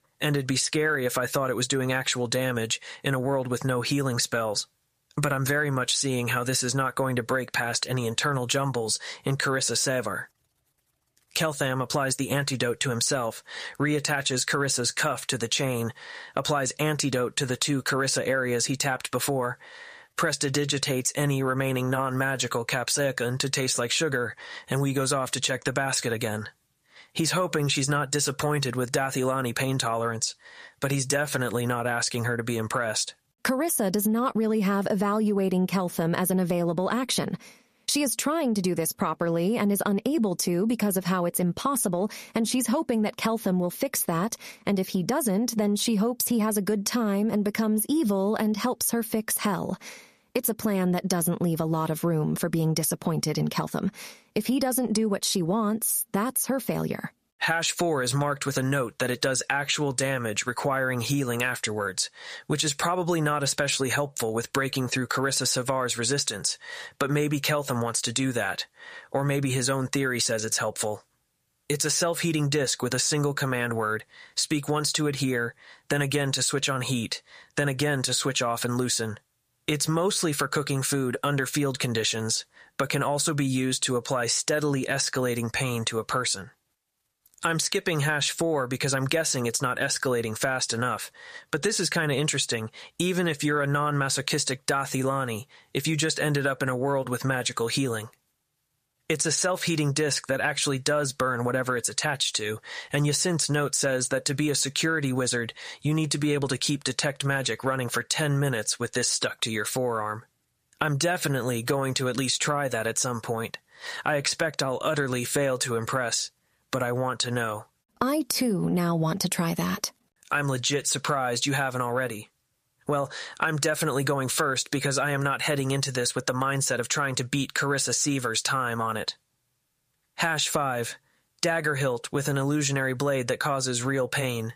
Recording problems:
squashed, flat; heavily

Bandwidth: 14.5 kHz